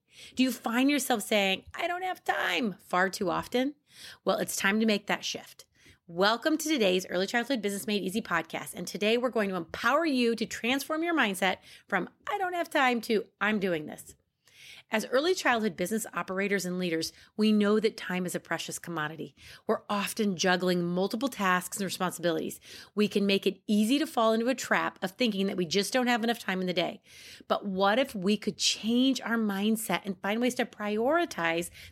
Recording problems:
none

